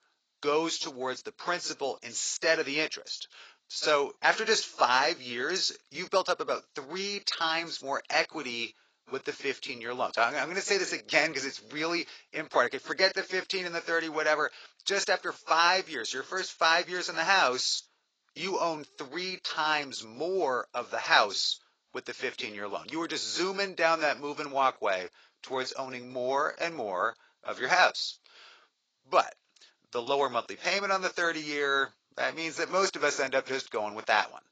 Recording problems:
garbled, watery; badly; nothing above 7.5 kHz
thin; very; fading below 600 Hz

